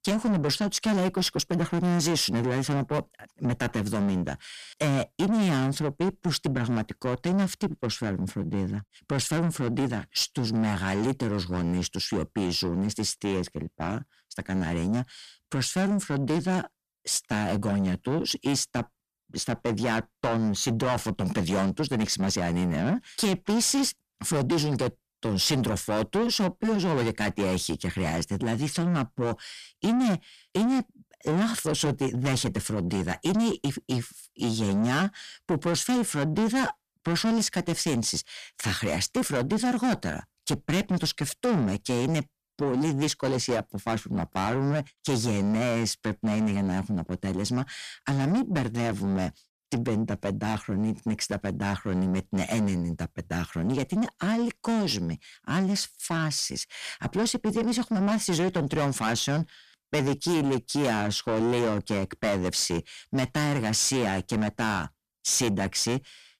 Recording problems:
distortion; heavy; 7 dB below the speech

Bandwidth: 14.5 kHz